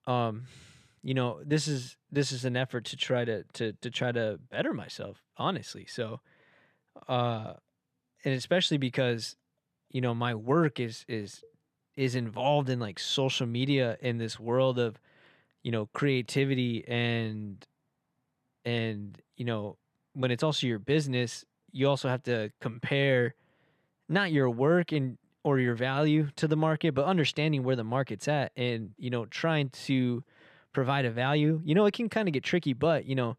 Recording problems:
none

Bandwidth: 14 kHz